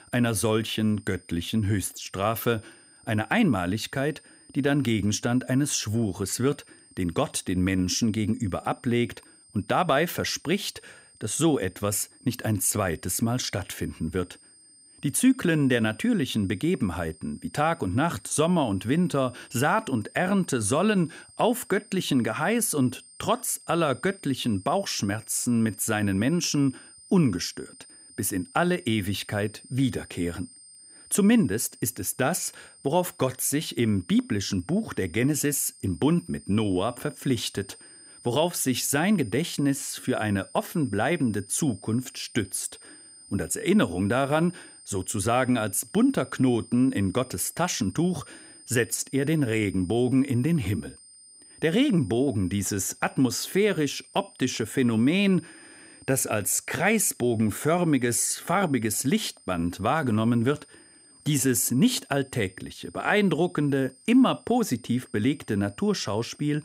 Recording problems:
high-pitched whine; faint; throughout; 9 kHz, 25 dB below the speech

